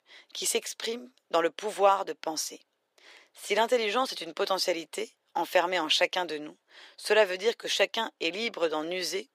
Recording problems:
thin; very; fading below 450 Hz

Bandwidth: 15.5 kHz